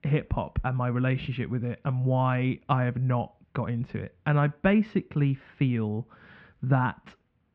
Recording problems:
muffled; very; fading above 2.5 kHz

